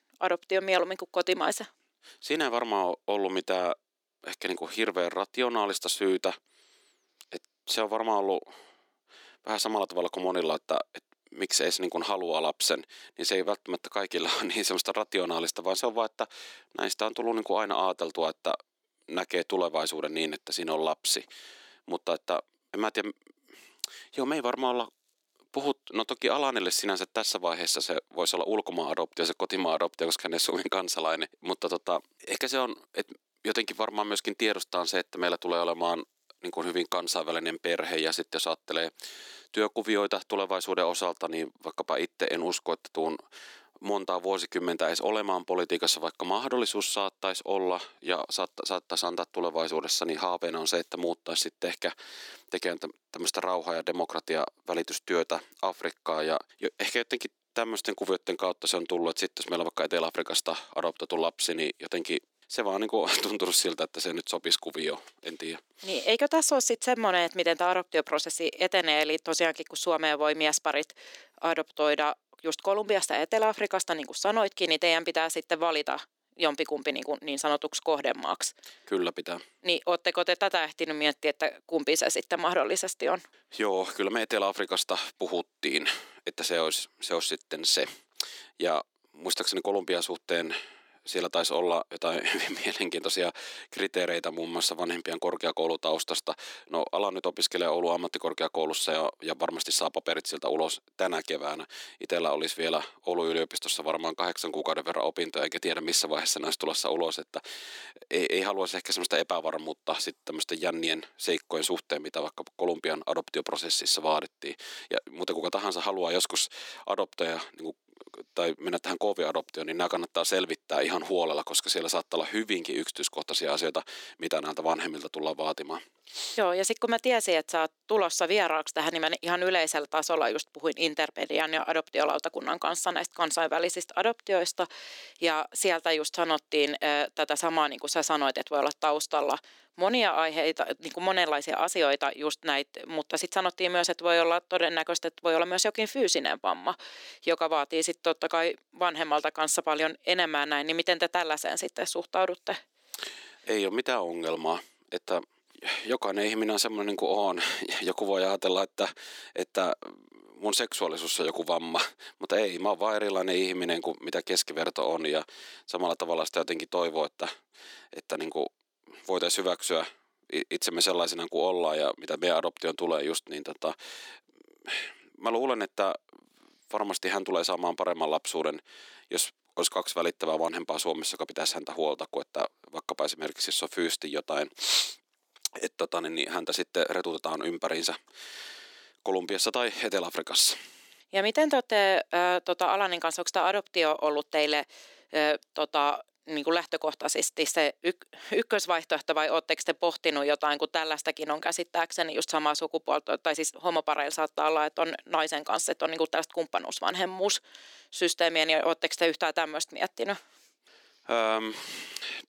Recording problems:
thin; somewhat; fading below 250 Hz

